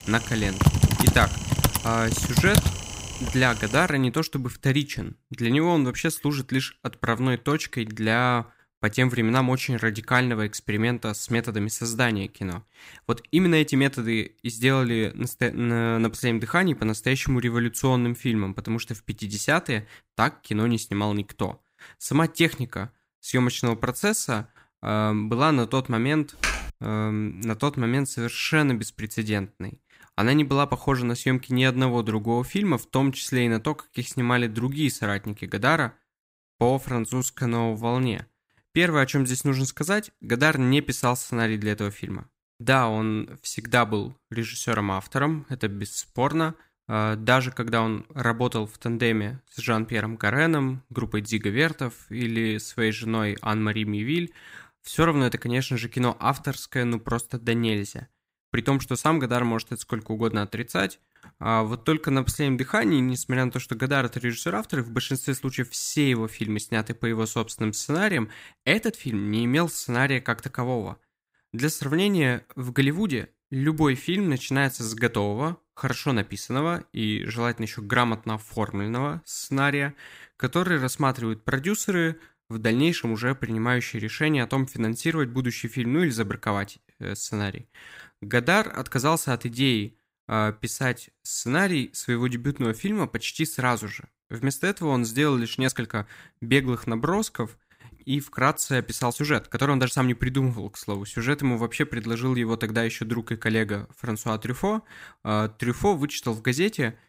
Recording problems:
keyboard typing; loud; until 3.5 s; peak 5 dB above the speech
uneven, jittery; strongly; from 3 s to 1:46
keyboard typing; noticeable; at 26 s; peak 2 dB below the speech

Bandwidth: 15.5 kHz